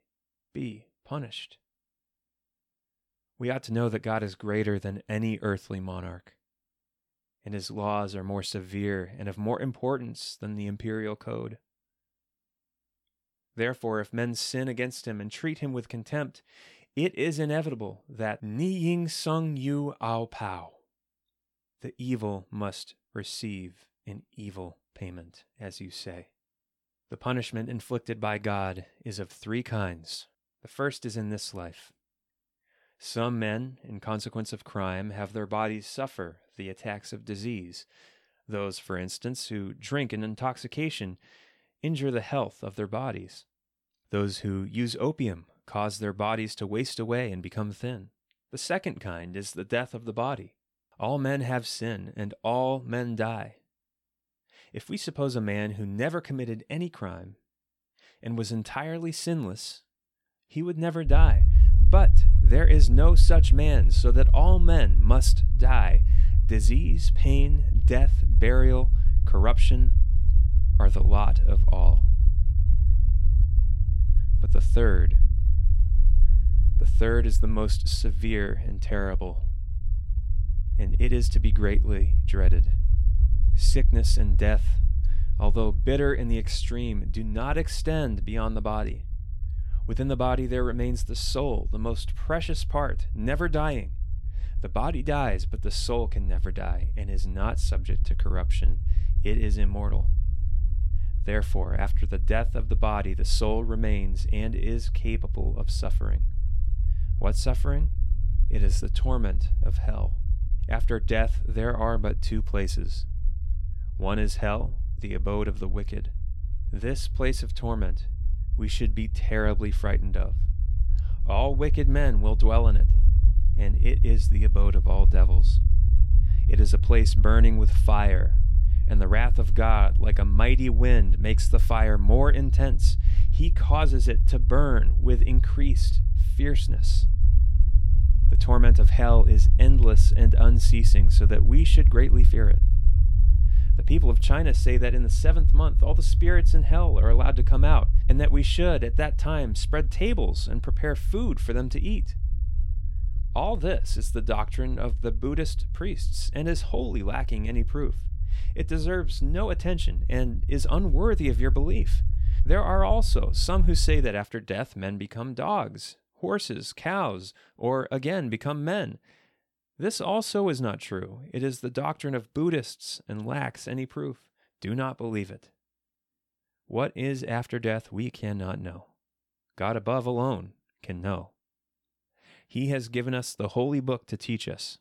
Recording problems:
low rumble; noticeable; from 1:01 to 2:44; 15 dB below the speech

